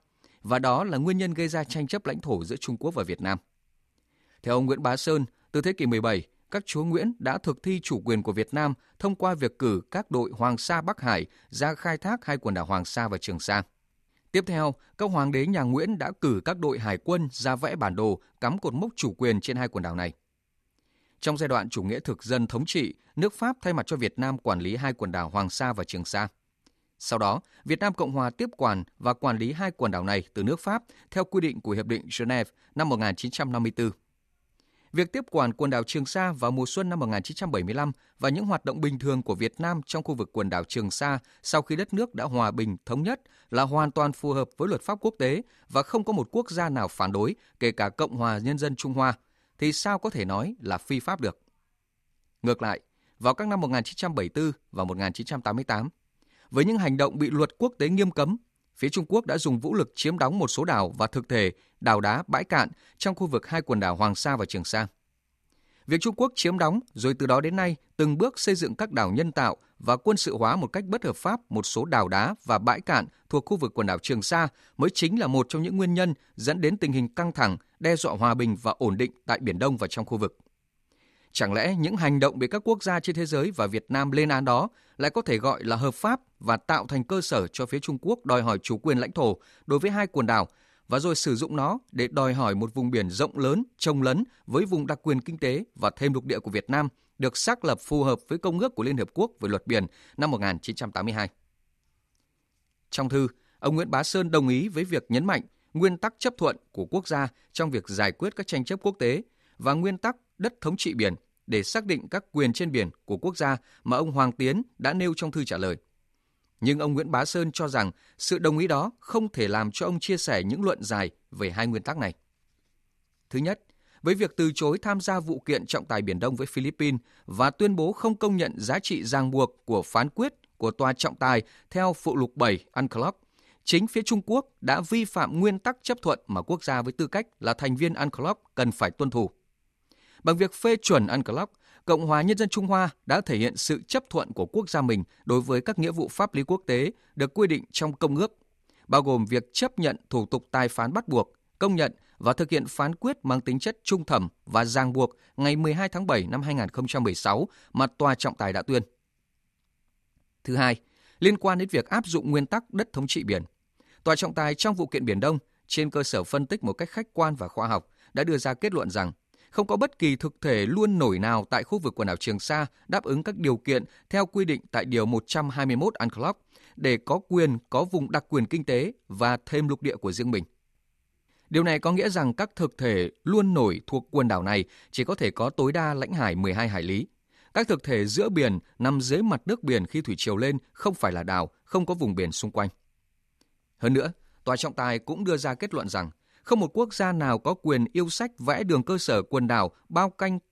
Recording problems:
none

